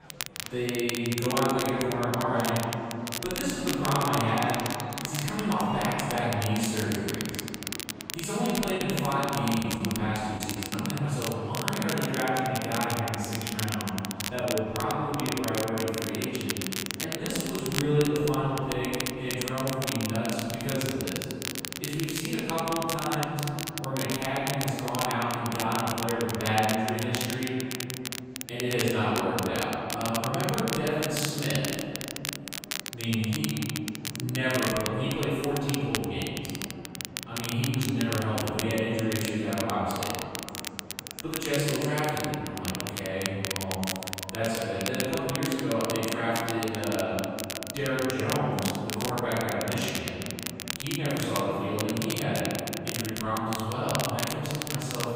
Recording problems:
room echo; strong; dies away in 2.9 s
off-mic speech; far
crackle, like an old record; loud; 6 dB below the speech
murmuring crowd; noticeable; throughout; 20 dB below the speech
choppy; very; from 9 to 11 s; 9% of the speech affected

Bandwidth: 15.5 kHz